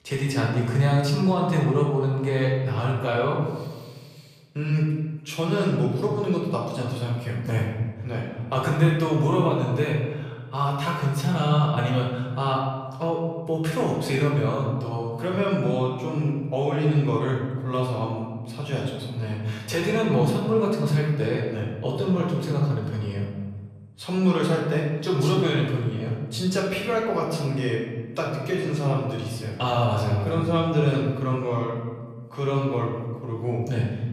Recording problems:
off-mic speech; far
room echo; noticeable; dies away in 1.2 s

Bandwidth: 14.5 kHz